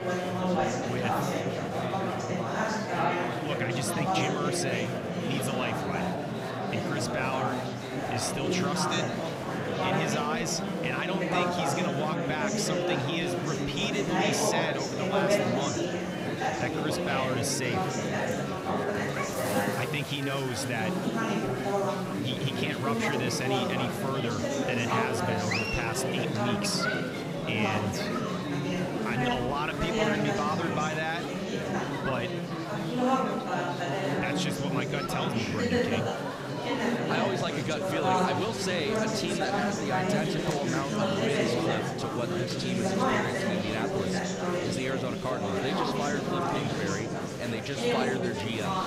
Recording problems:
murmuring crowd; very loud; throughout; 3 dB above the speech

